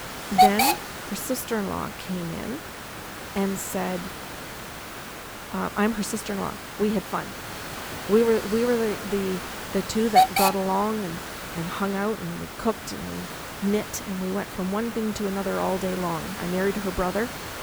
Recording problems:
hiss; loud; throughout; 2 dB below the speech

